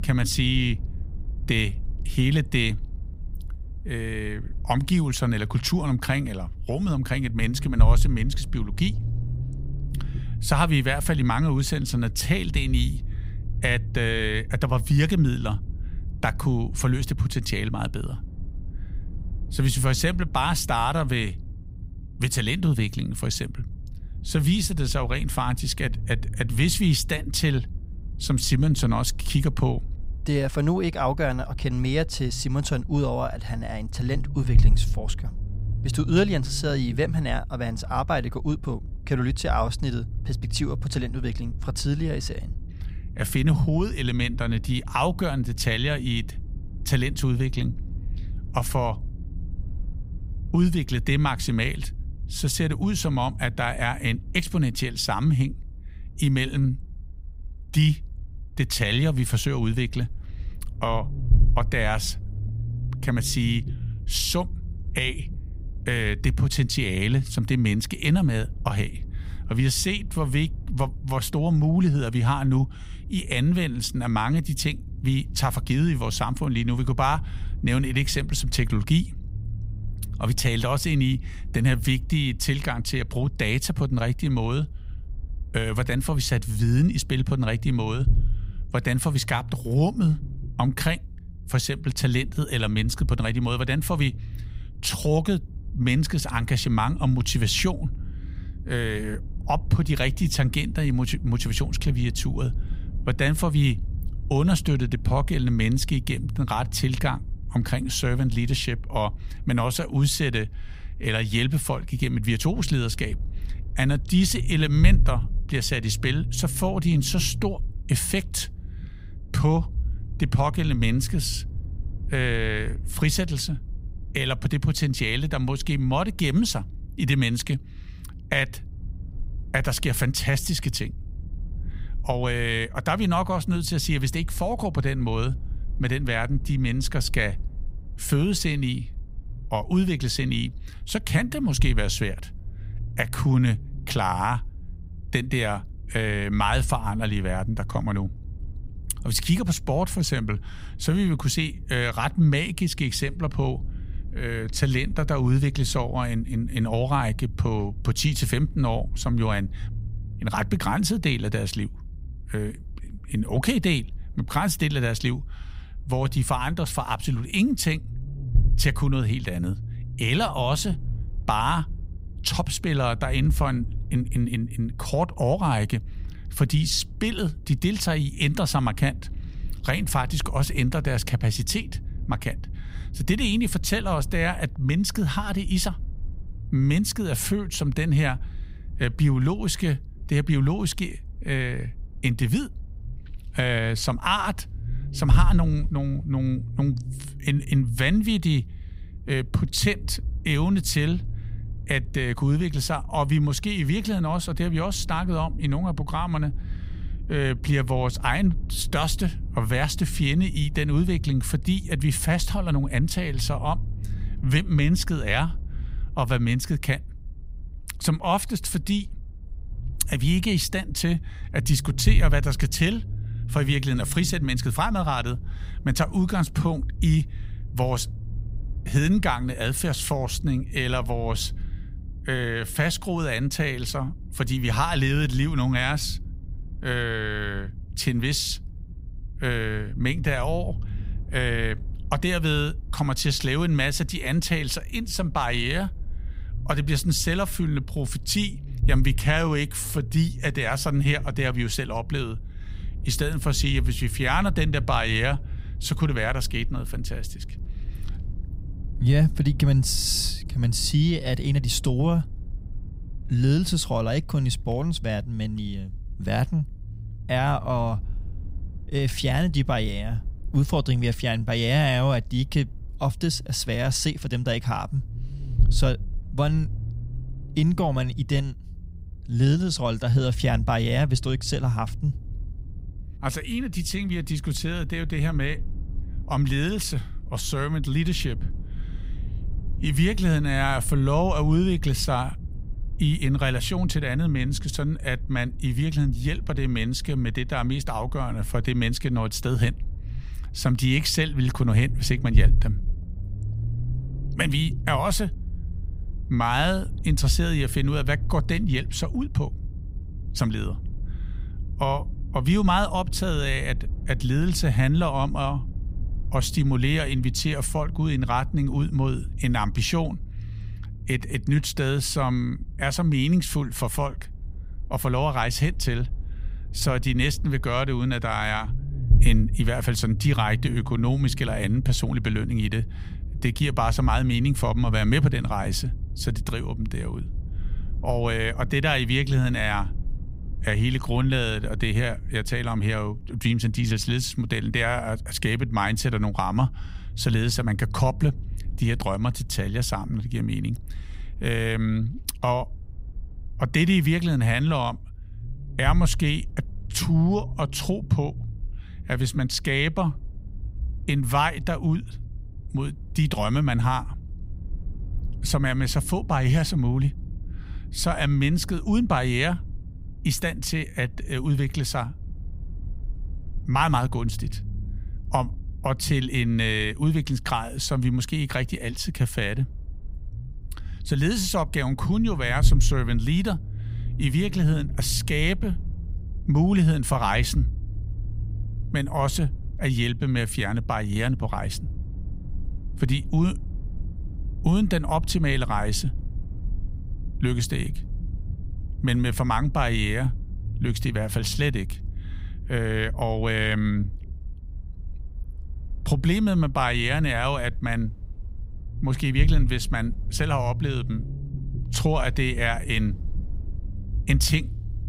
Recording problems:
low rumble; faint; throughout; 20 dB below the speech

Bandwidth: 15.5 kHz